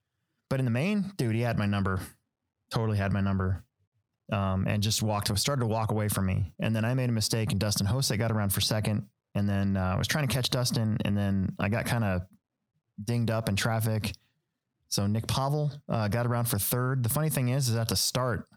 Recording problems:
squashed, flat; somewhat

